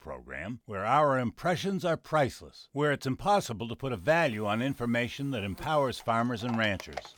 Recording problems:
animal sounds; noticeable; from 4 s on; 20 dB below the speech

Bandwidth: 19 kHz